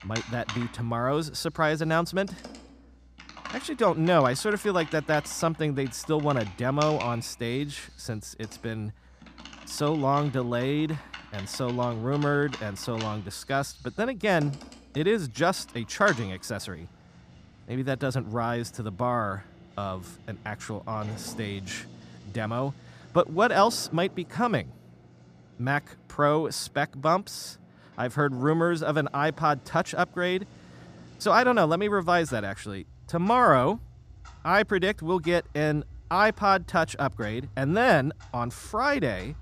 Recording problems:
household noises; noticeable; throughout; 20 dB below the speech

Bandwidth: 14.5 kHz